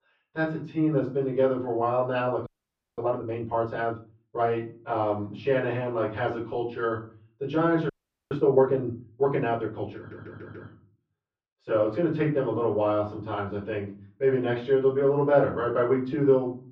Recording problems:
off-mic speech; far
muffled; very; fading above 3 kHz
room echo; slight; dies away in 0.4 s
audio freezing; at 2.5 s for 0.5 s and at 8 s
audio stuttering; at 10 s

